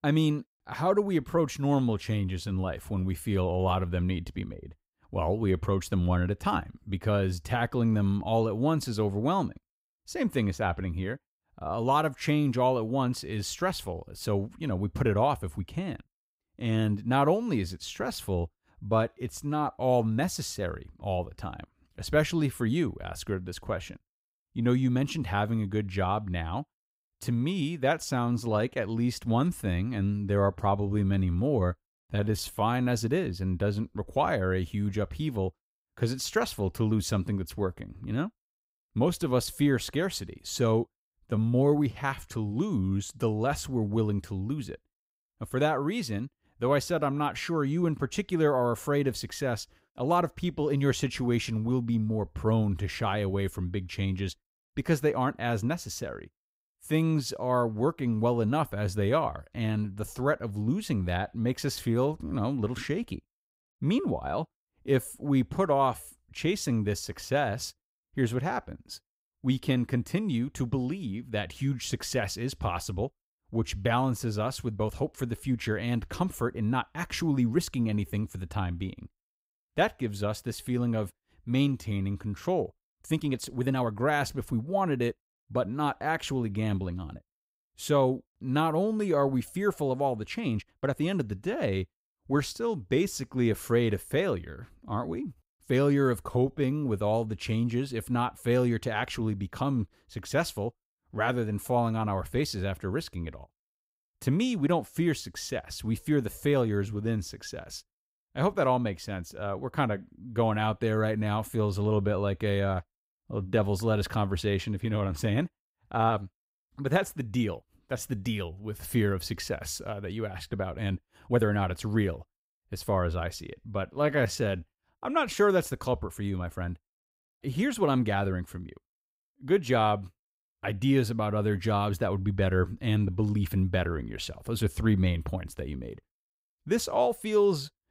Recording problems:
uneven, jittery; strongly; from 32 s to 2:08

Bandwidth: 15.5 kHz